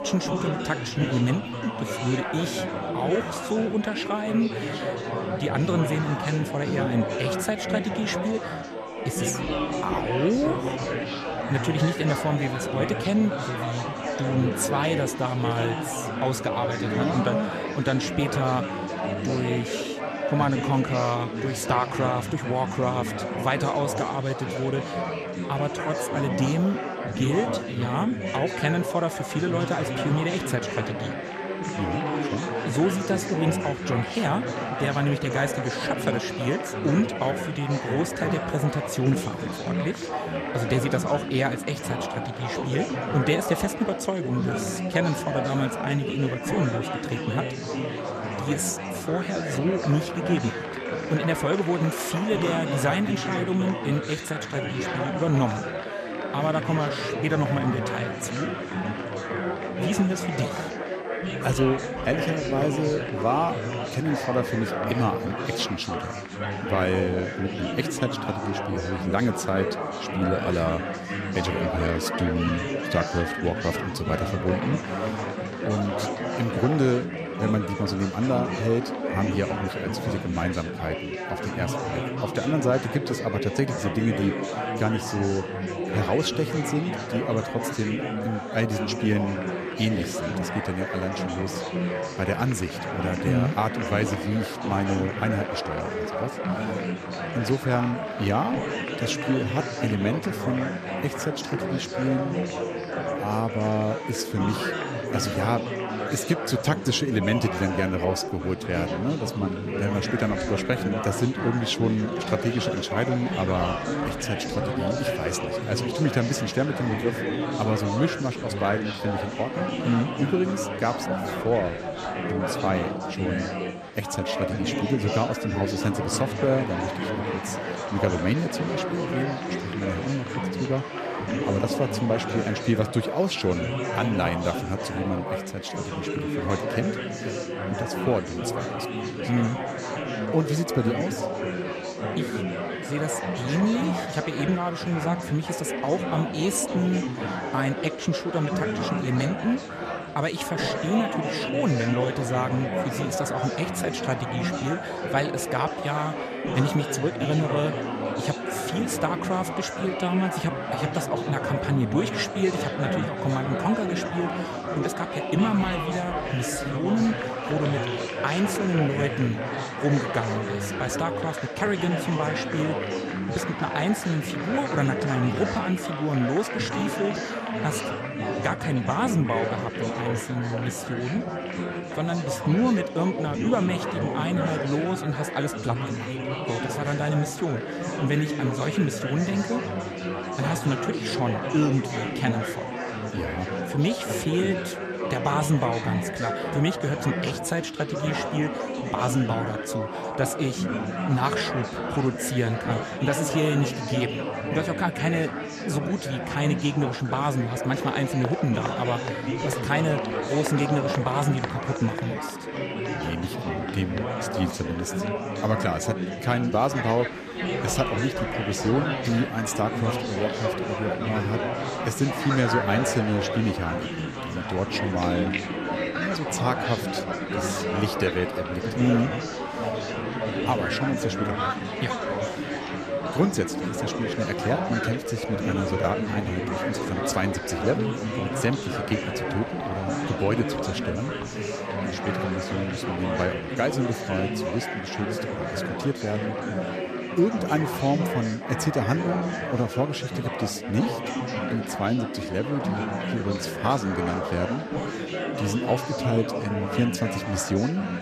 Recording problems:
chatter from many people; loud; throughout; 2 dB below the speech
high-pitched whine; faint; throughout; 3 kHz, 35 dB below the speech

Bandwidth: 14.5 kHz